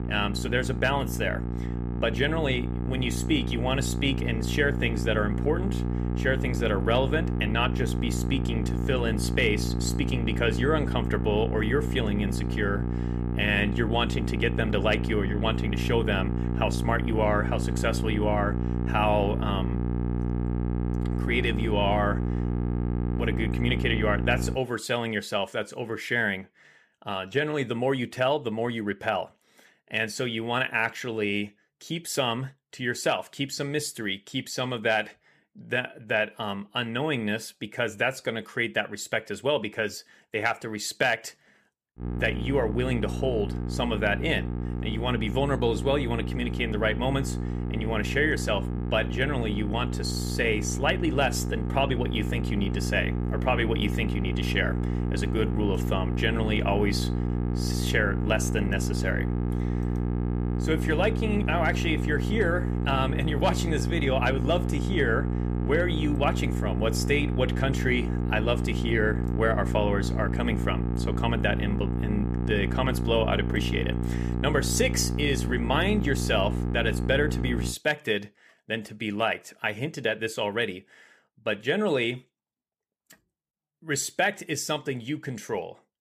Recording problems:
electrical hum; loud; until 25 s and from 42 s to 1:18; 60 Hz, 9 dB below the speech

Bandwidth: 15 kHz